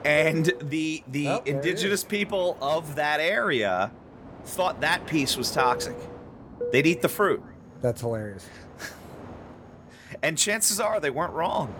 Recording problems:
train or aircraft noise; noticeable; throughout; 15 dB below the speech

